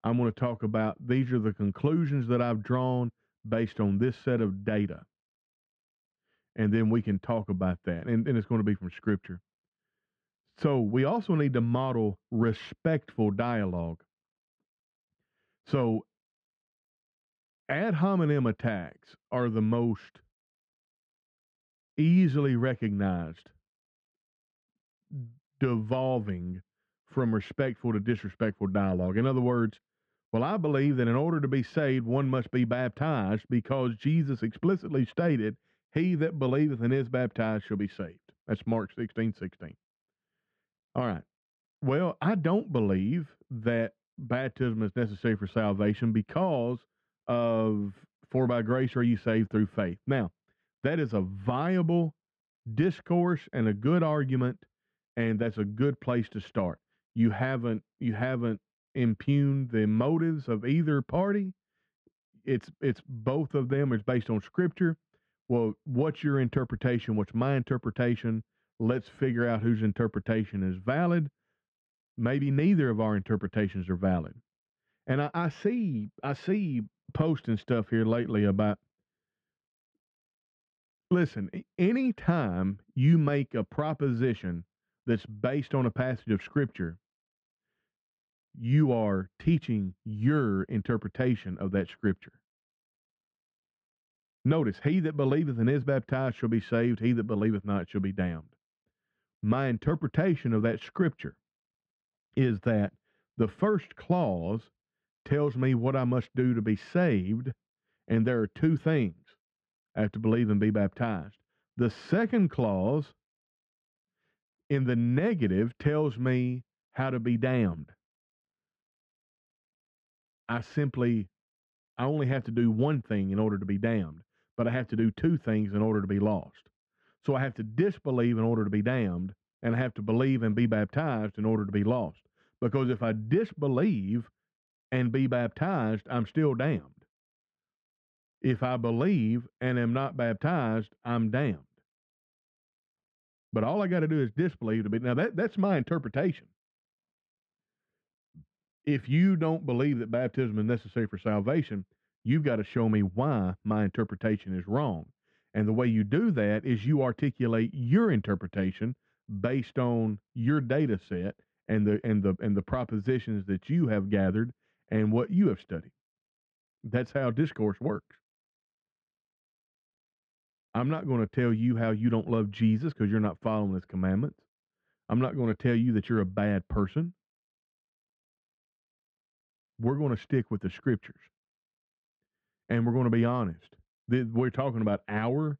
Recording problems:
muffled; very; fading above 2.5 kHz

